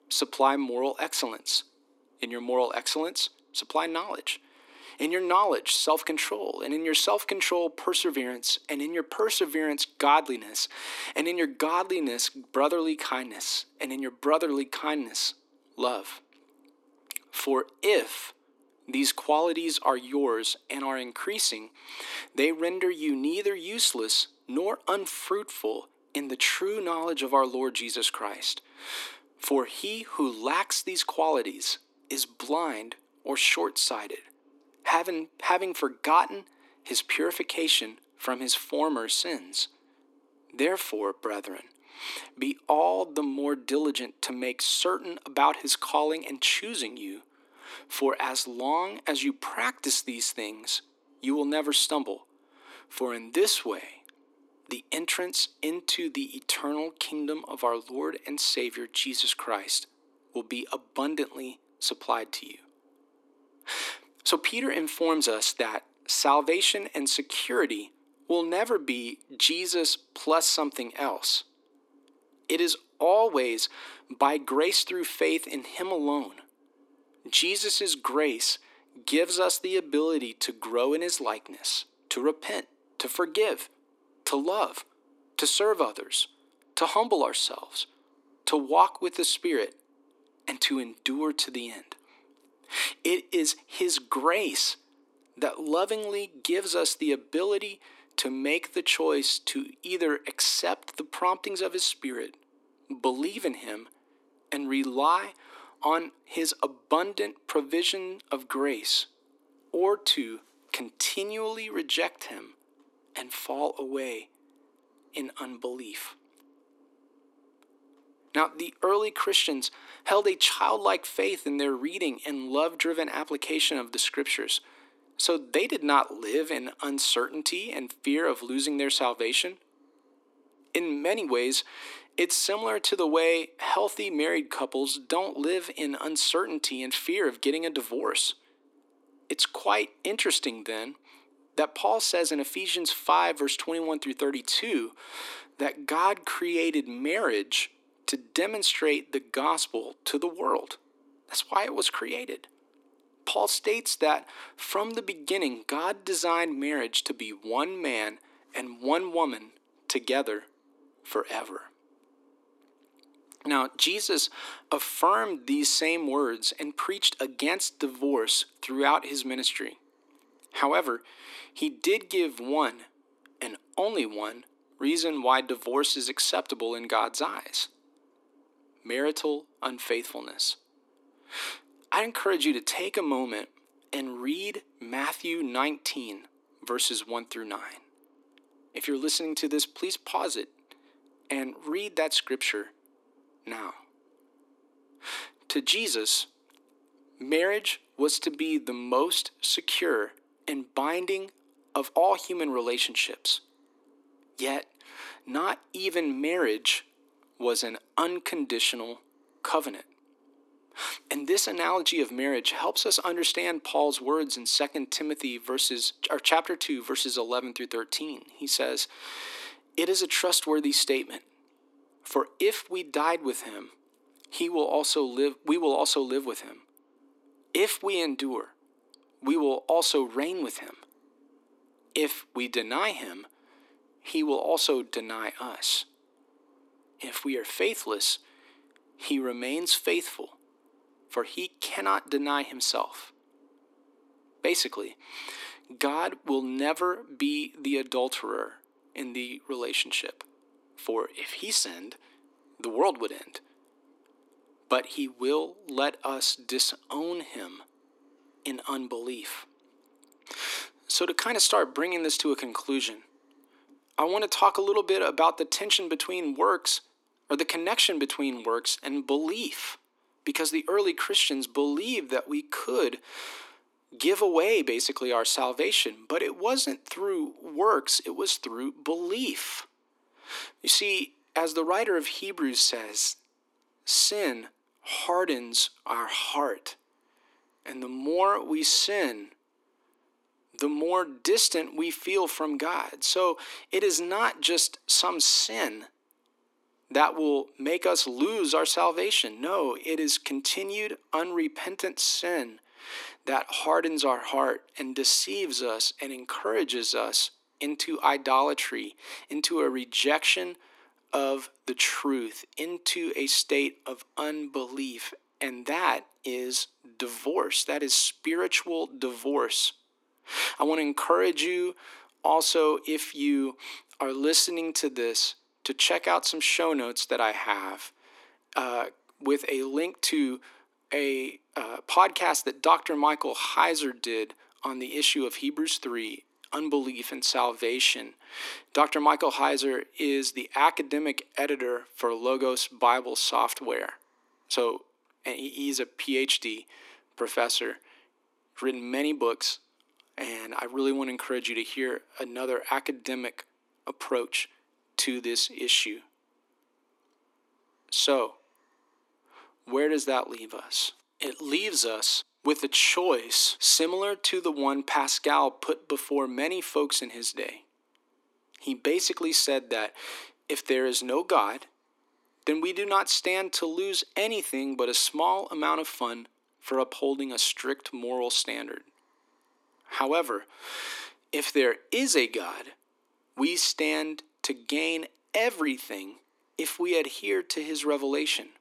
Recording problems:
thin; somewhat; fading below 250 Hz

